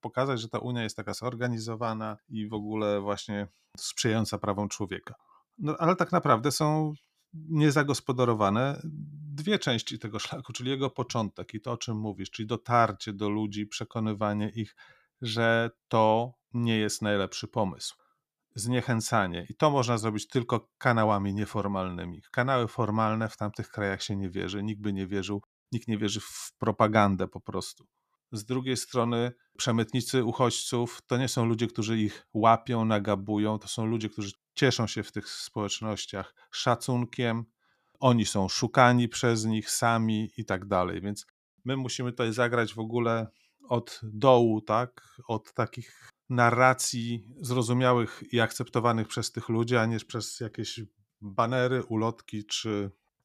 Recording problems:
none

